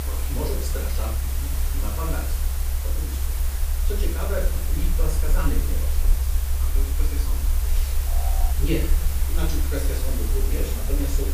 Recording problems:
off-mic speech; far
room echo; noticeable; dies away in 0.5 s
hiss; loud; throughout; 1 dB below the speech
low rumble; noticeable; throughout; 10 dB below the speech
alarm; noticeable; at 8 s; peak 4 dB below the speech

